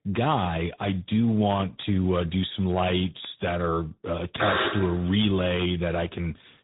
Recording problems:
high frequencies cut off; severe; nothing above 3.5 kHz
garbled, watery; slightly
alarm; loud; at 4.5 s; peak 1 dB above the speech

